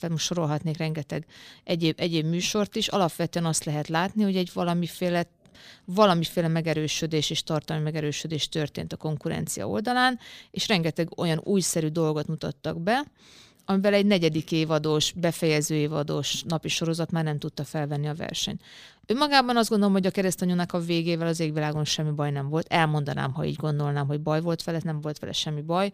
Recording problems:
none

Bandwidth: 15 kHz